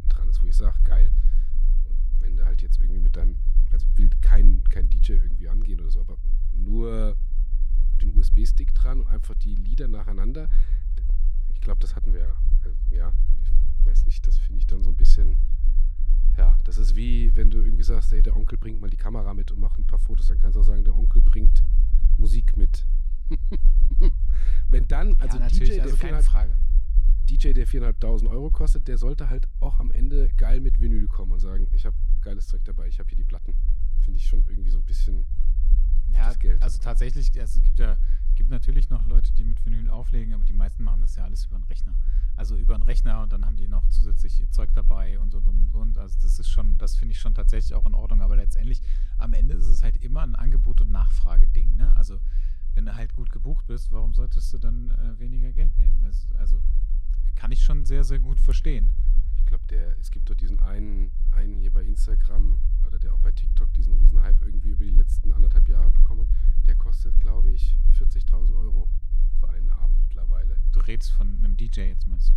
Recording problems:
low rumble; loud; throughout; 10 dB below the speech

